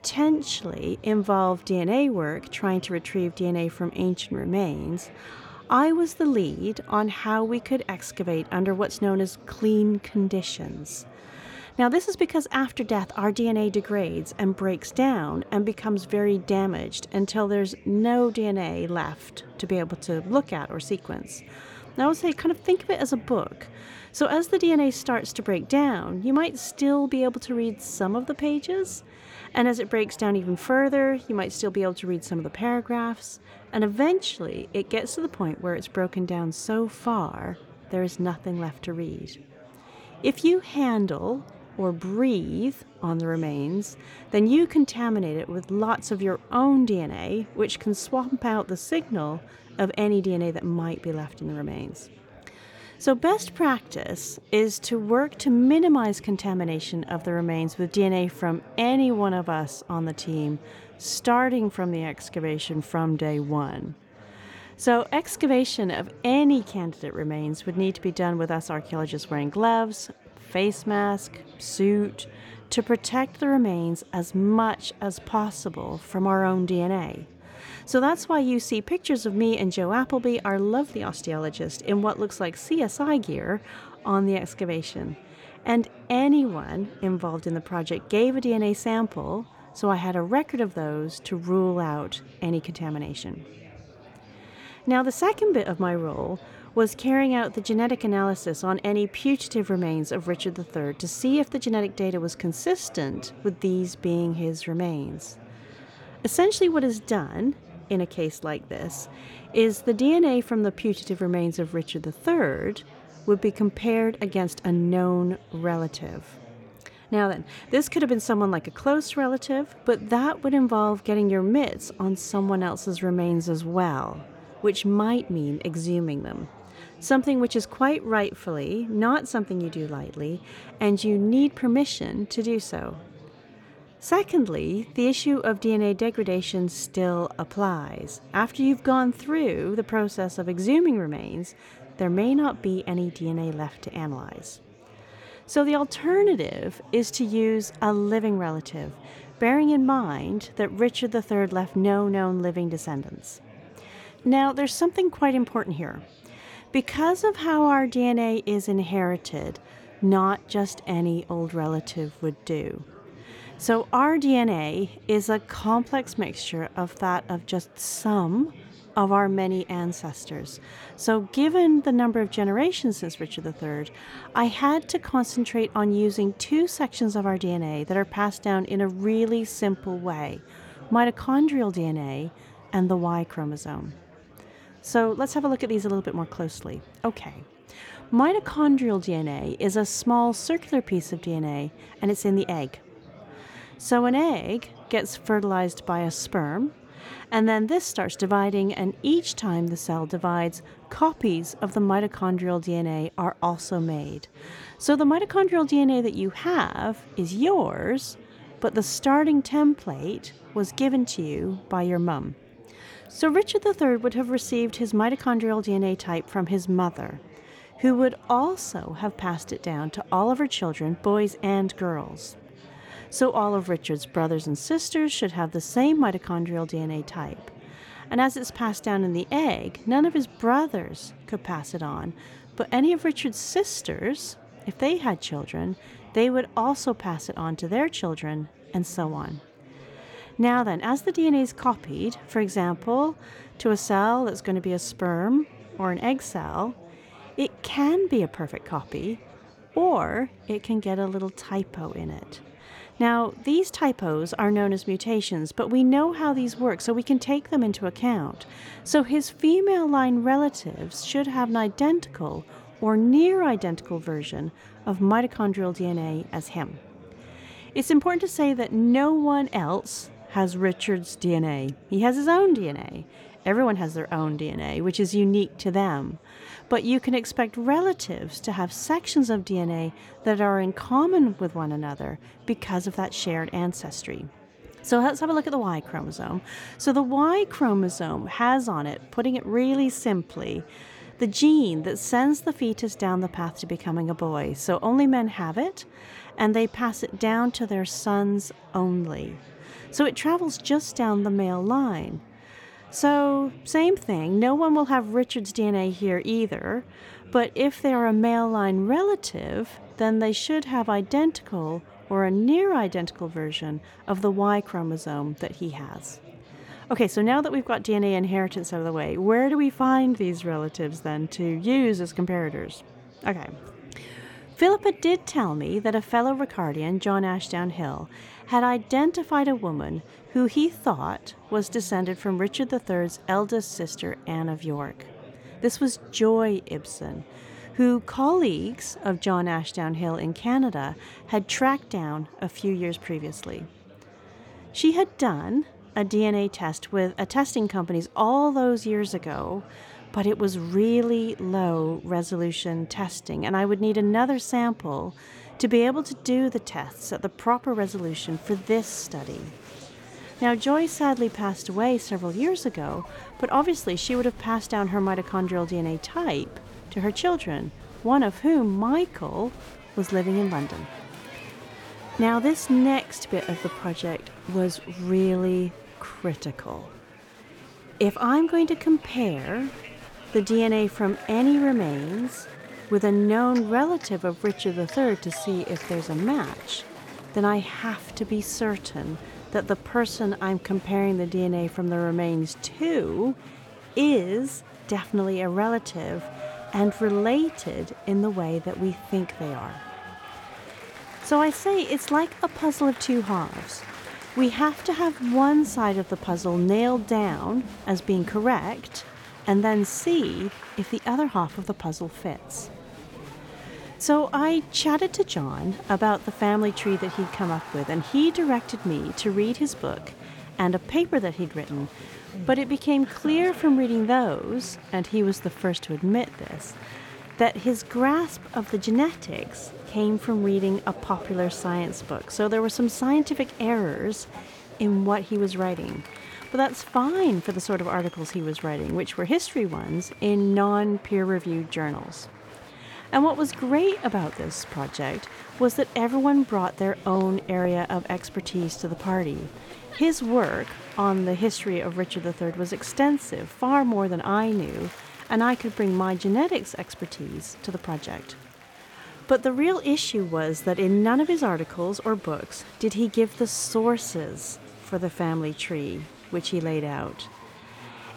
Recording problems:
murmuring crowd; faint; throughout; 20 dB below the speech

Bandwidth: 18 kHz